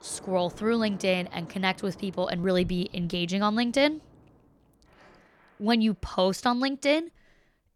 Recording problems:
rain or running water; faint; throughout; 25 dB below the speech

